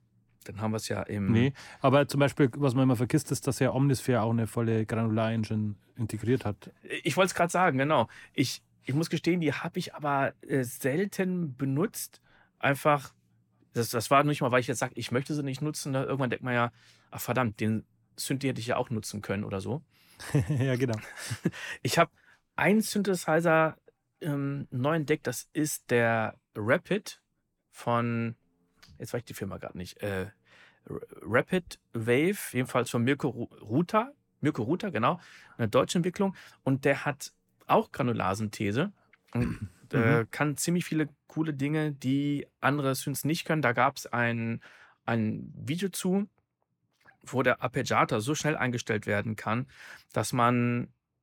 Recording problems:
none

